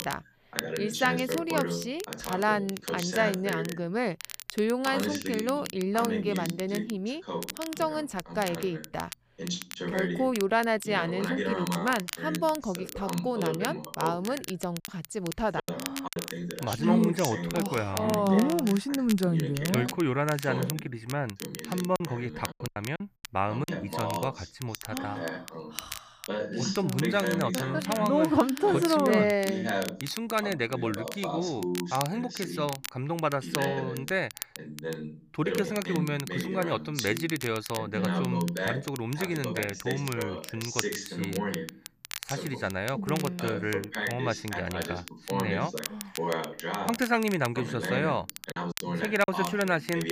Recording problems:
voice in the background; loud; throughout; 6 dB below the speech
crackle, like an old record; noticeable; 10 dB below the speech
choppy; very; from 15 to 16 s, from 22 to 24 s and at 49 s; 13% of the speech affected

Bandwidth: 15 kHz